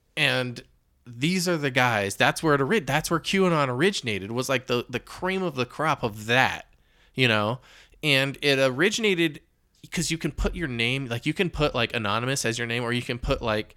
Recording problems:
none

